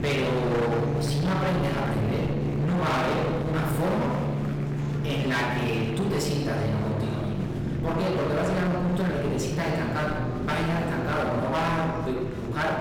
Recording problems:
distortion; heavy; 32% of the sound clipped
off-mic speech; far
room echo; noticeable; dies away in 1.2 s
background music; loud; throughout; 5 dB below the speech
murmuring crowd; noticeable; throughout; 15 dB below the speech
low rumble; noticeable; throughout; 10 dB below the speech

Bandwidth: 18 kHz